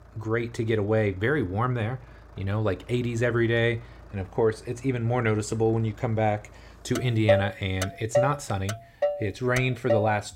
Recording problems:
traffic noise; loud; throughout; 3 dB below the speech

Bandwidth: 16 kHz